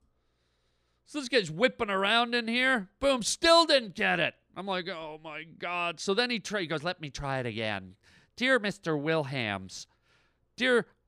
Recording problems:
none

